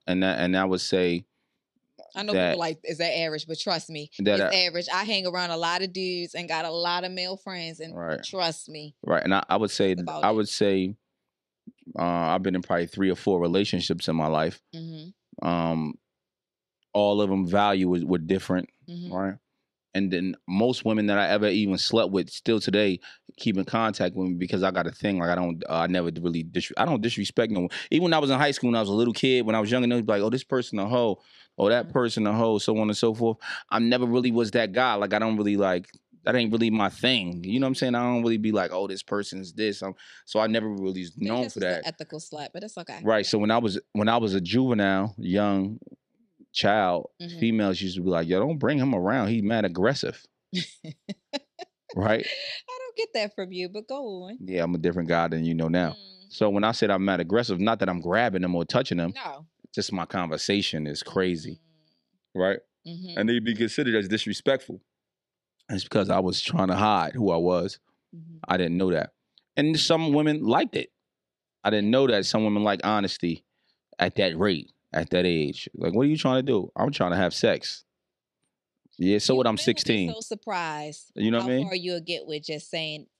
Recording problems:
none

